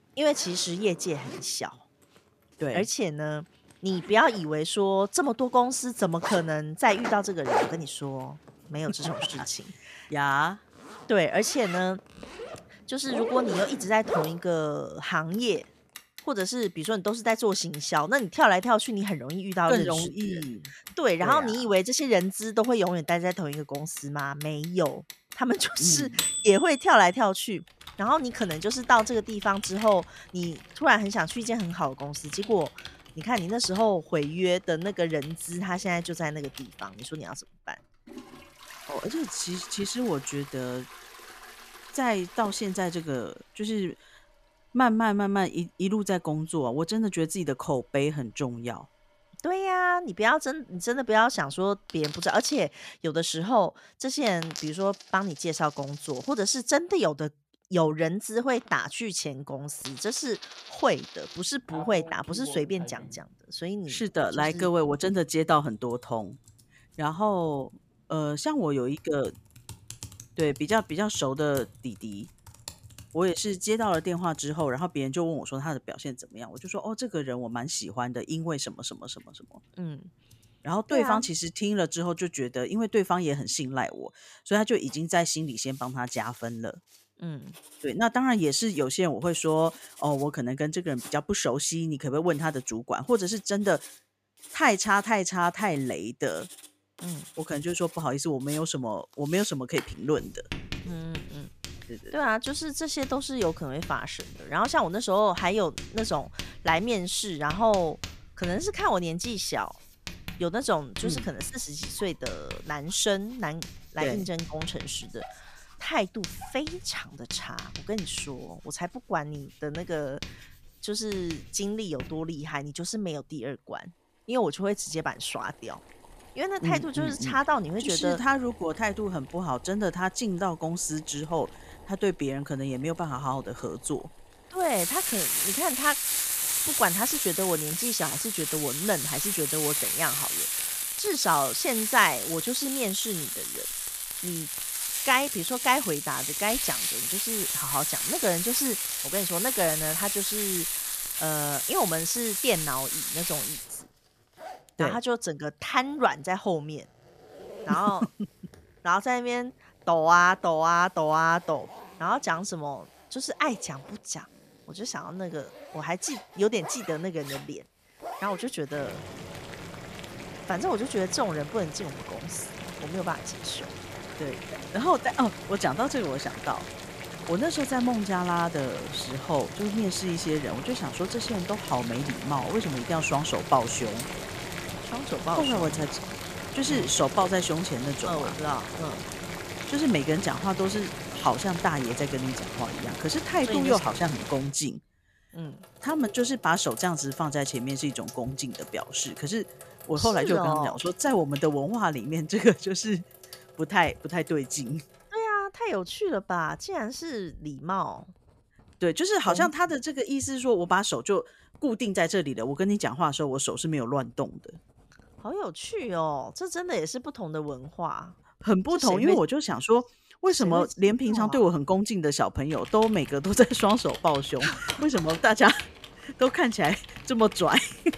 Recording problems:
household noises; loud; throughout; 6 dB below the speech

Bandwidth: 14.5 kHz